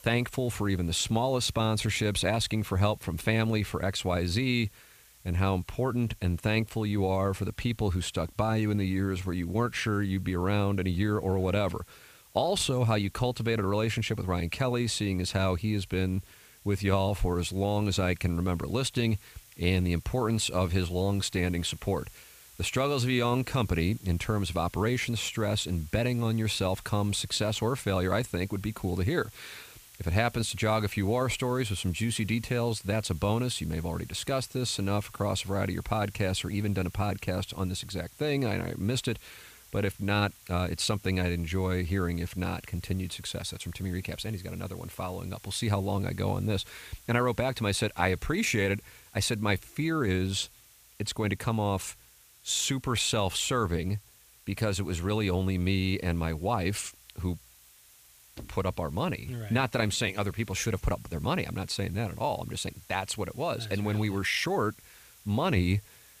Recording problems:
hiss; faint; throughout; 25 dB below the speech

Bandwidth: 15 kHz